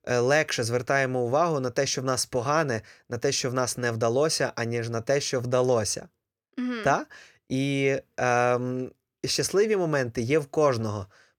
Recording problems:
none

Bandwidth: 19 kHz